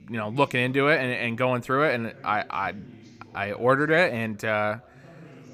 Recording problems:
background chatter; faint; throughout; 2 voices, 25 dB below the speech

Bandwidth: 15.5 kHz